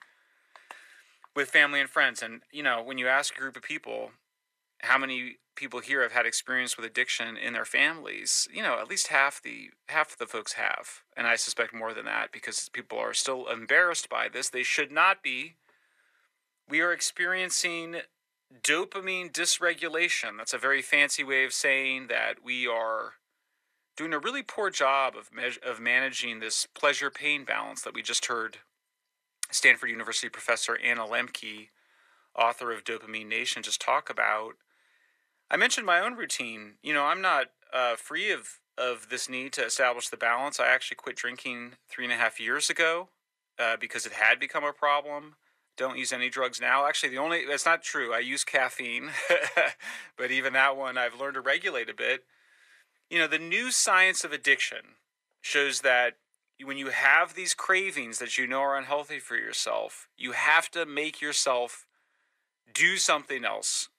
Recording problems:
thin; very; fading below 600 Hz

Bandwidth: 14 kHz